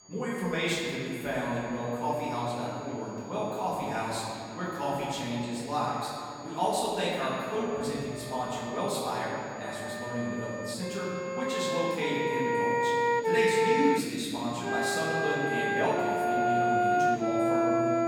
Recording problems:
room echo; strong; dies away in 2.6 s
off-mic speech; far
background music; very loud; throughout; 3 dB above the speech
high-pitched whine; faint; throughout; 6.5 kHz, 20 dB below the speech
chatter from many people; faint; throughout; 30 dB below the speech

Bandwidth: 18 kHz